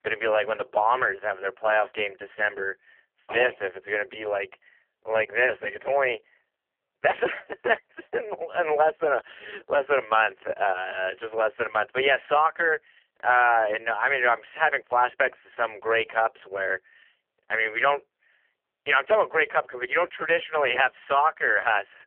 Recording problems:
phone-call audio; poor line; nothing above 3 kHz

